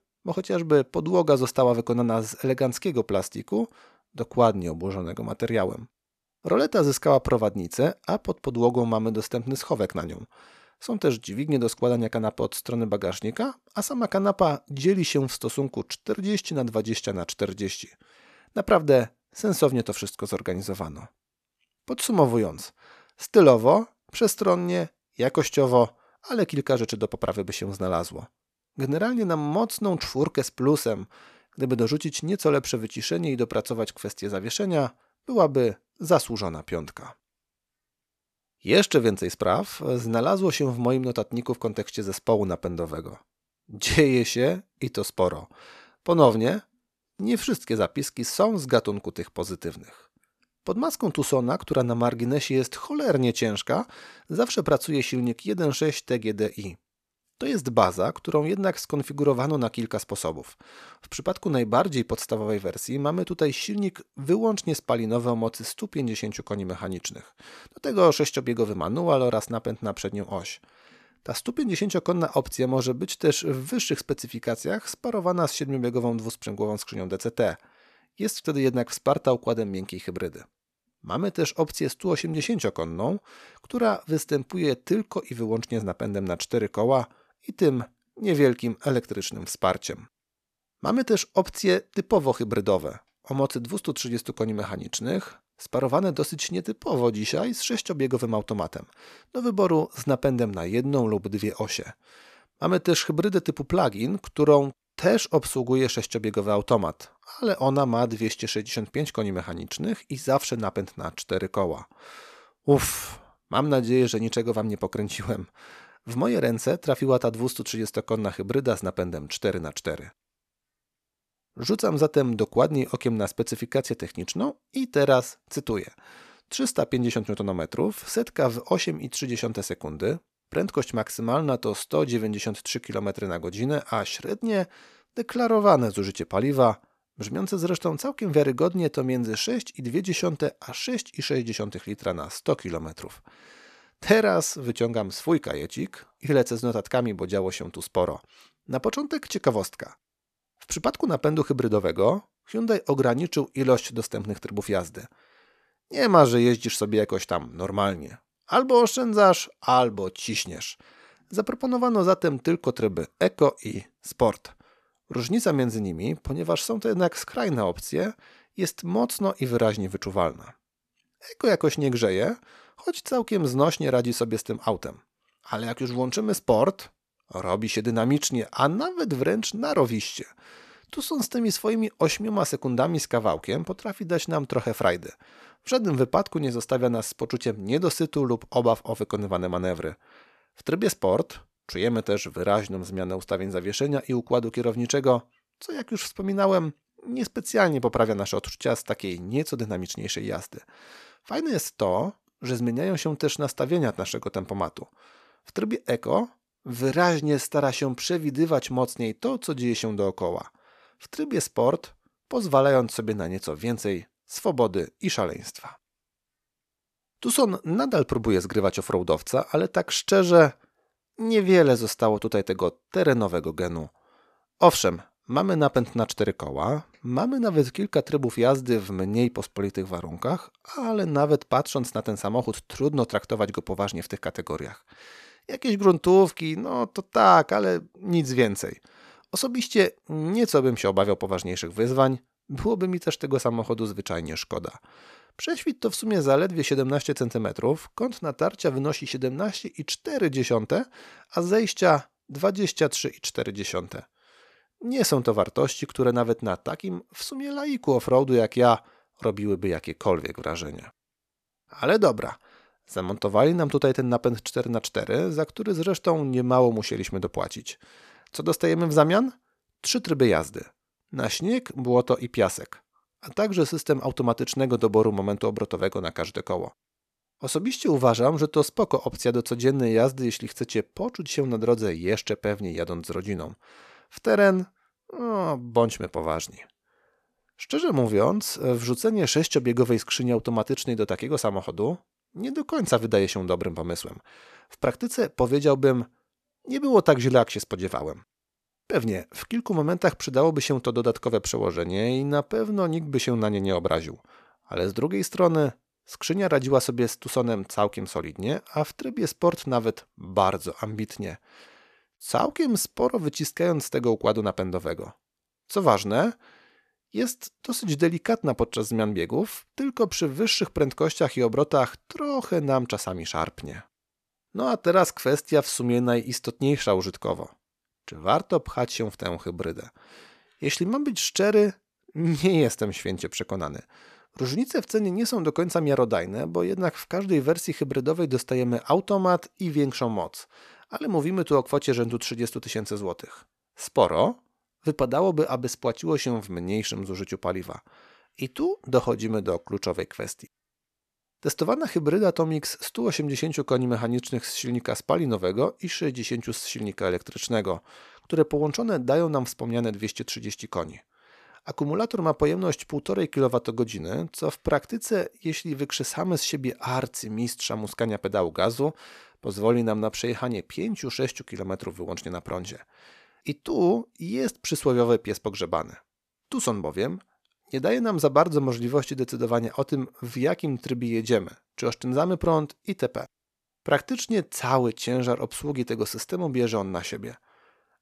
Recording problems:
none

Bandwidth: 14 kHz